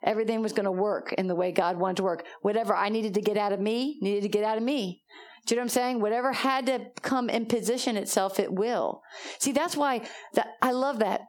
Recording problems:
squashed, flat; heavily

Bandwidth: 18 kHz